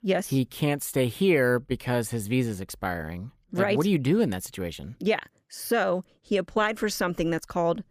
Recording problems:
none

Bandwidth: 15 kHz